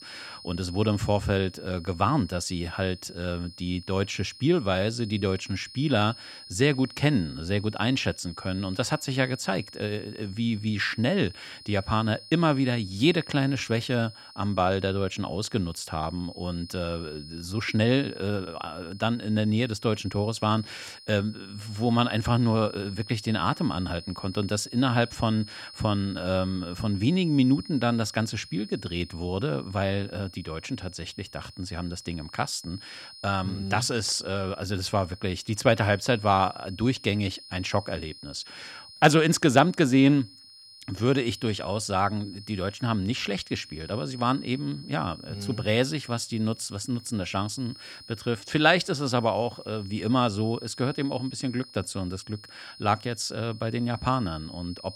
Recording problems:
high-pitched whine; noticeable; throughout; 5 kHz, 15 dB below the speech

